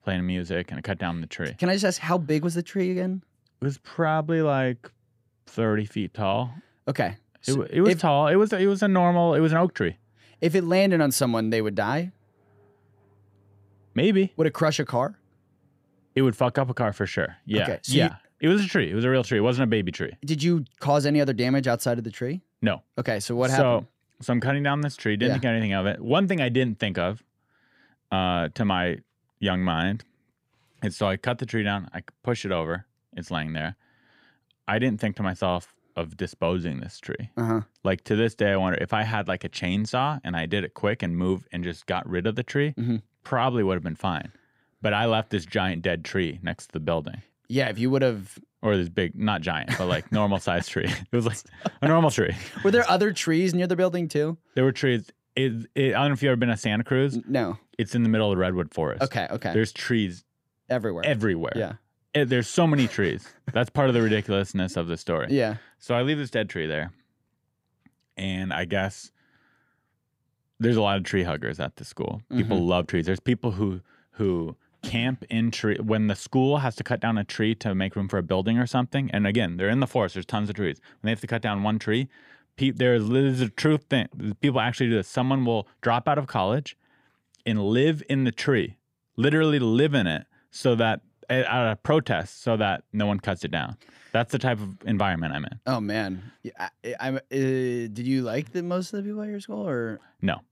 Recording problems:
none

